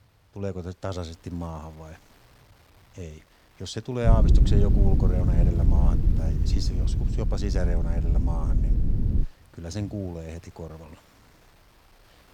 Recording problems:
low rumble; loud; from 4 to 9 s; 2 dB below the speech
wind noise on the microphone; occasional gusts; 20 dB below the speech

